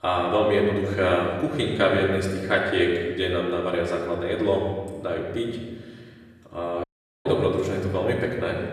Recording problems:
off-mic speech; far
room echo; noticeable; dies away in 1.4 s
audio cutting out; at 7 s

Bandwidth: 14.5 kHz